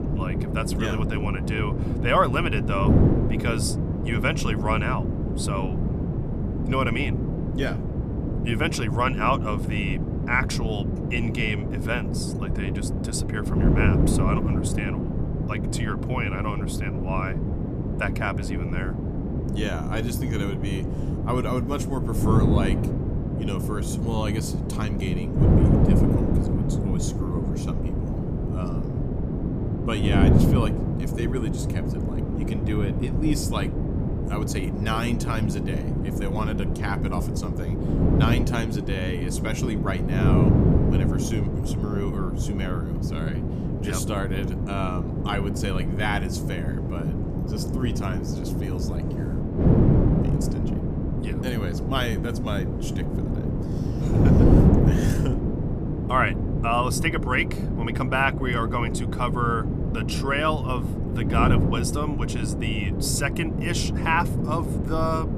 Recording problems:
wind noise on the microphone; heavy; 4 dB below the speech

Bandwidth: 14.5 kHz